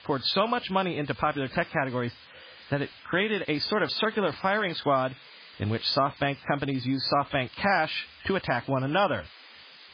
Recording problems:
garbled, watery; badly; nothing above 4.5 kHz
hiss; faint; throughout; 20 dB below the speech

